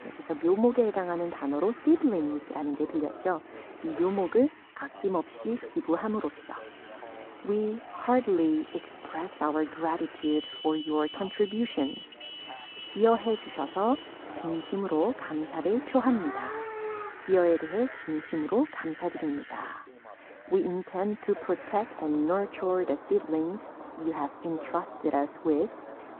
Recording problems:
muffled; very; fading above 4 kHz
phone-call audio
traffic noise; noticeable; throughout; 15 dB below the speech
voice in the background; noticeable; throughout; 20 dB below the speech

